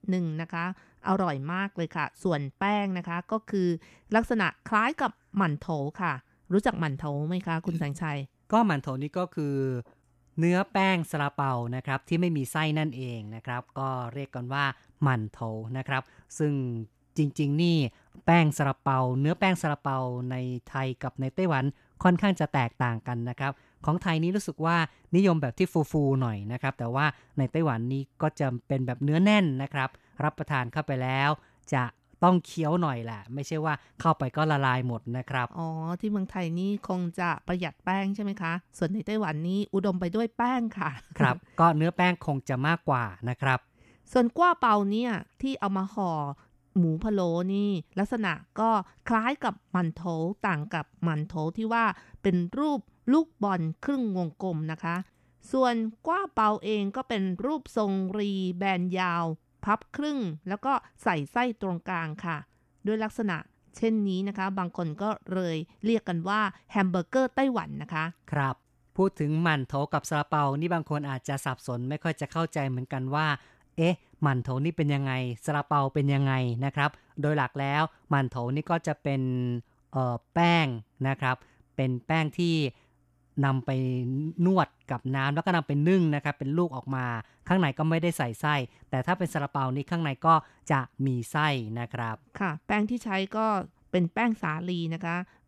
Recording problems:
none

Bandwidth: 14 kHz